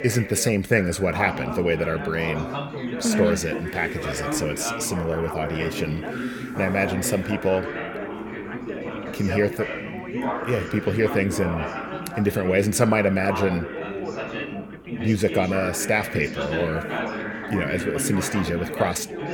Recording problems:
background chatter; loud; throughout; 4 voices, 6 dB below the speech

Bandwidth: 18.5 kHz